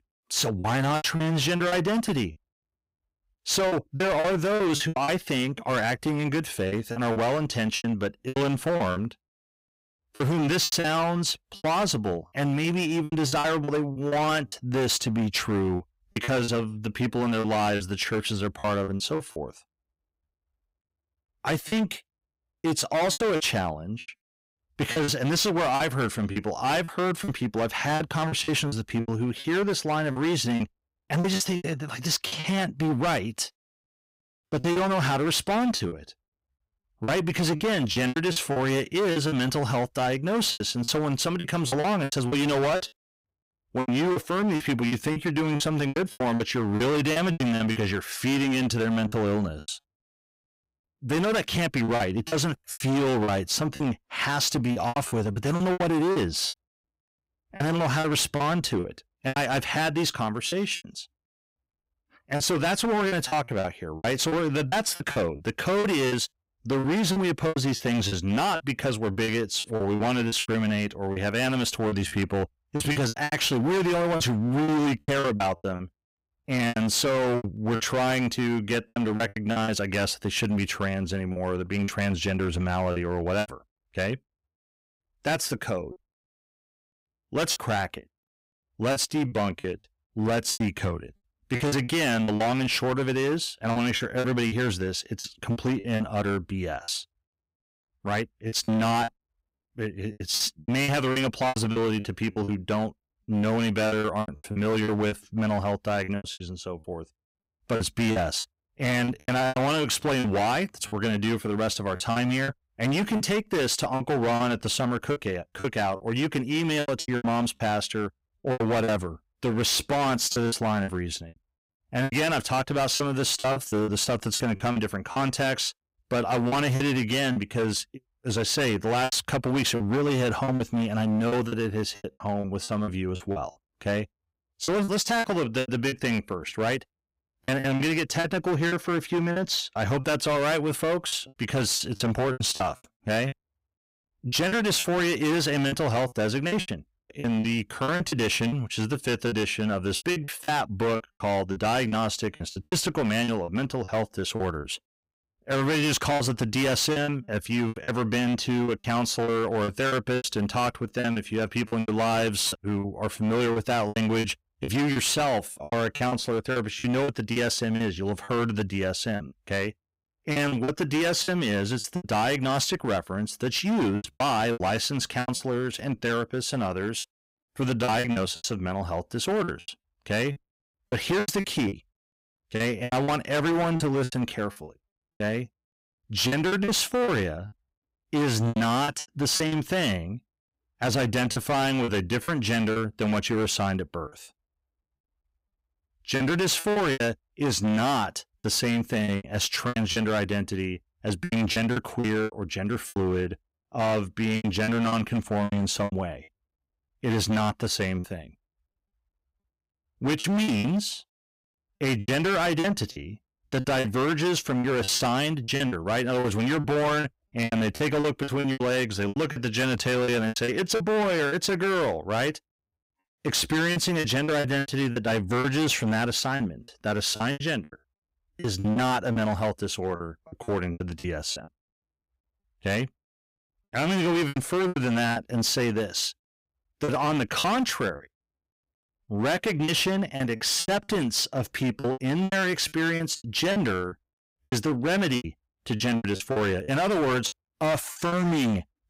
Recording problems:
distortion; heavy; 18% of the sound clipped
choppy; very; 12% of the speech affected

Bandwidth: 15.5 kHz